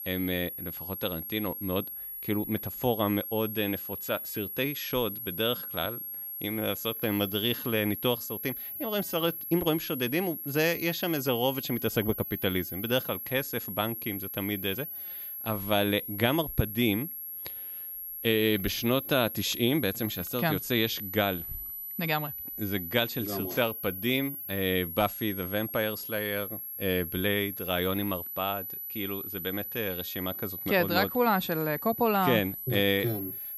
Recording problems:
high-pitched whine; loud; throughout; 11.5 kHz, 6 dB below the speech

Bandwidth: 14.5 kHz